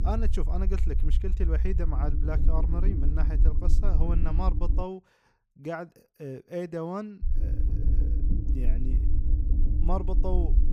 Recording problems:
low rumble; loud; until 5 s and from 7 s on; 8 dB below the speech

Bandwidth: 15.5 kHz